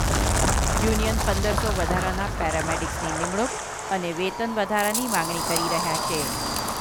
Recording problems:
wind noise on the microphone; heavy; as loud as the speech
animal sounds; loud; throughout; 7 dB below the speech

